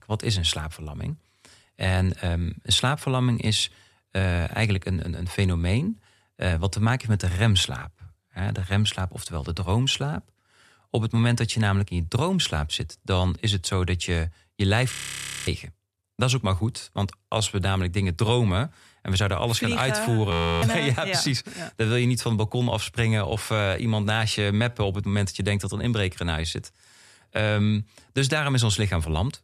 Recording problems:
audio freezing; at 15 s for 0.5 s and at 20 s

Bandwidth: 14 kHz